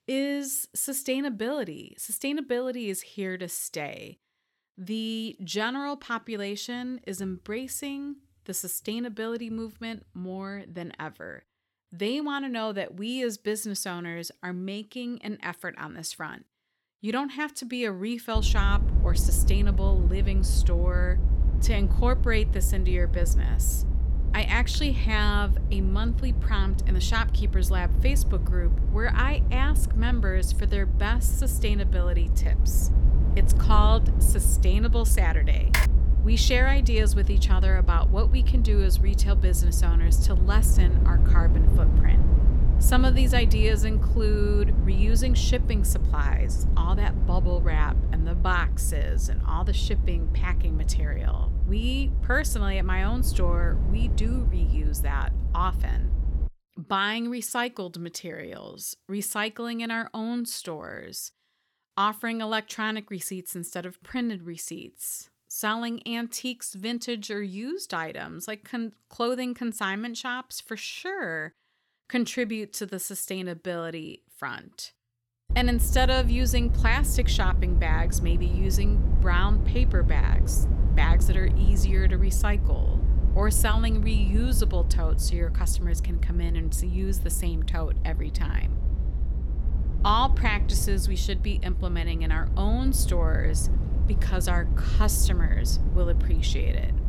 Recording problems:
low rumble; noticeable; from 18 to 56 s and from 1:16 on; 10 dB below the speech
keyboard typing; loud; at 36 s; peak 4 dB above the speech

